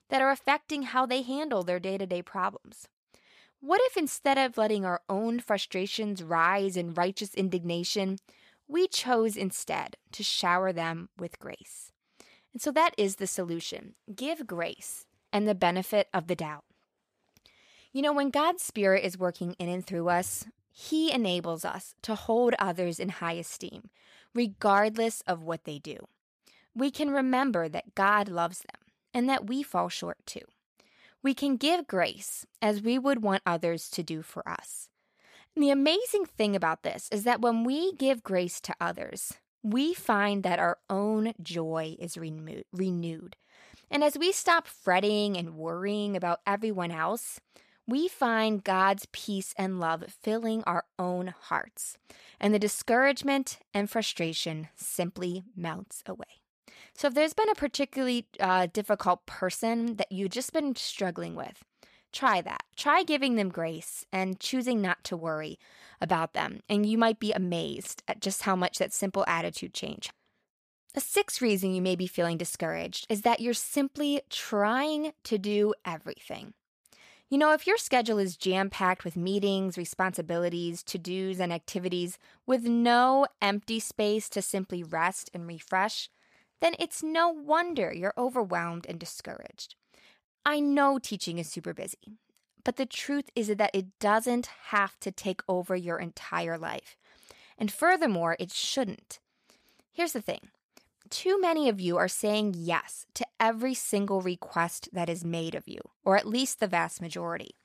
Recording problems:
none

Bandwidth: 14.5 kHz